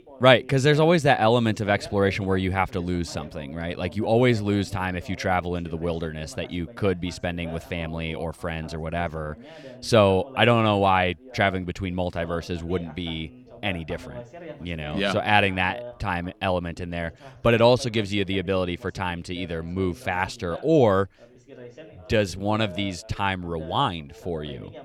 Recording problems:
background chatter; noticeable; throughout; 2 voices, 20 dB below the speech

